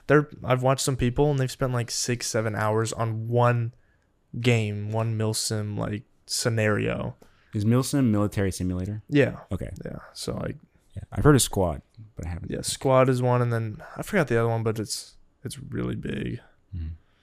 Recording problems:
none

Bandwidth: 15 kHz